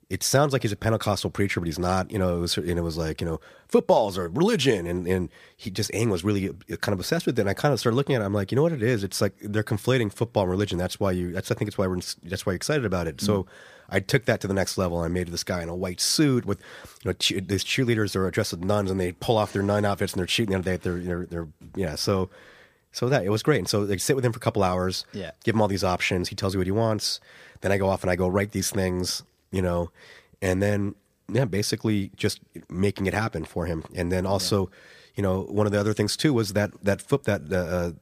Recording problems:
none

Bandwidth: 15 kHz